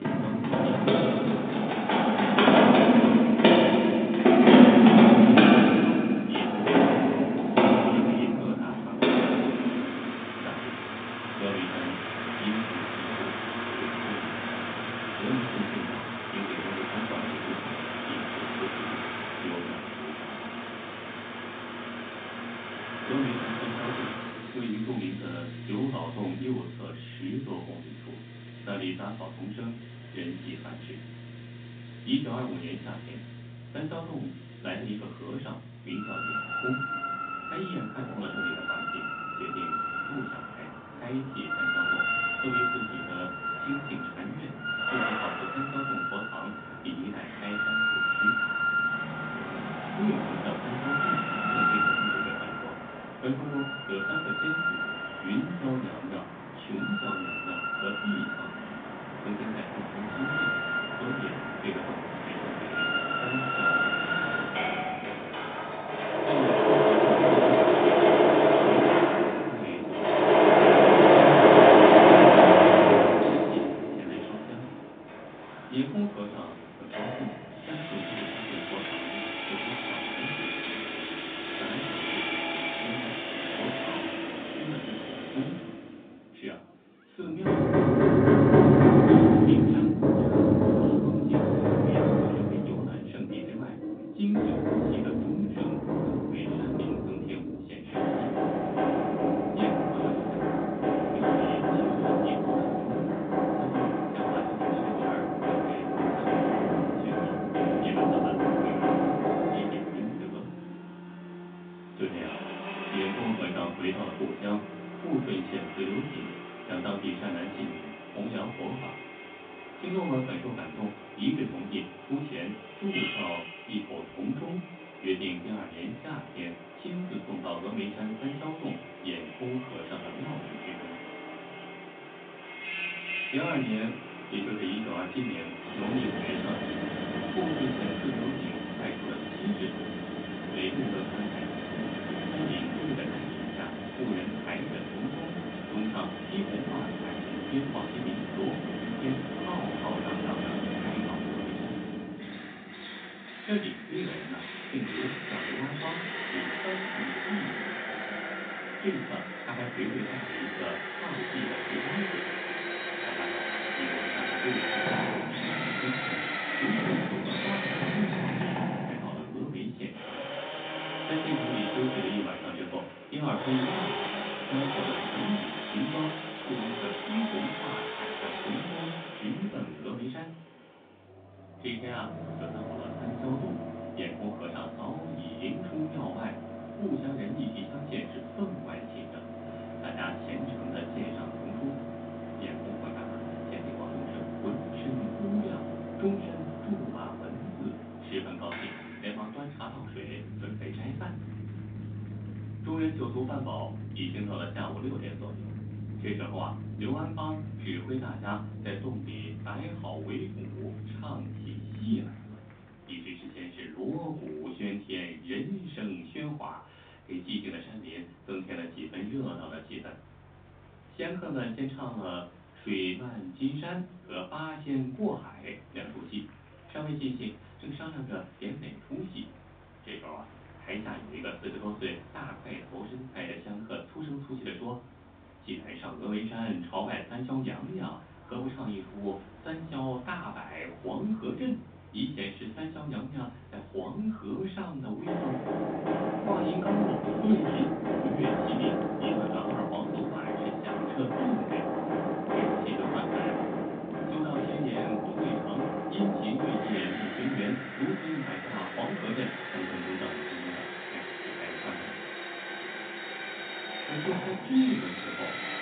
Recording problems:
off-mic speech; far
room echo; slight; dies away in 0.3 s
phone-call audio
machinery noise; very loud; throughout; 10 dB above the speech
chatter from many people; faint; throughout; 25 dB below the speech

